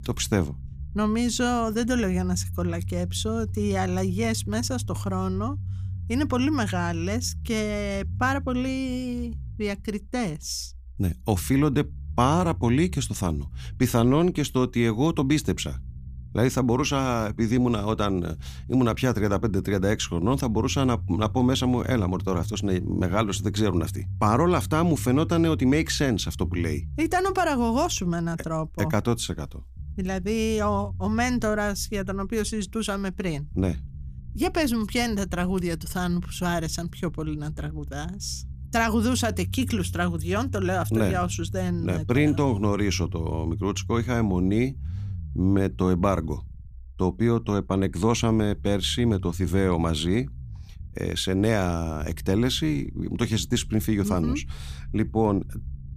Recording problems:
low rumble; faint; throughout; 25 dB below the speech

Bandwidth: 15 kHz